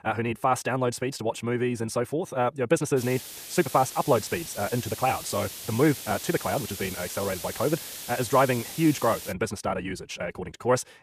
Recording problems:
wrong speed, natural pitch; too fast; 1.7 times normal speed
hiss; loud; from 3 to 9.5 s; 9 dB below the speech

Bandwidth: 14.5 kHz